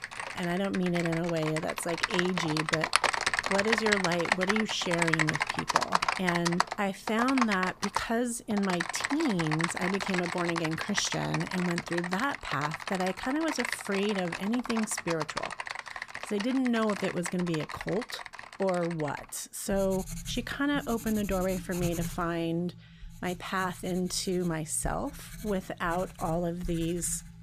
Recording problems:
household noises; loud; throughout; 2 dB below the speech

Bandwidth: 15 kHz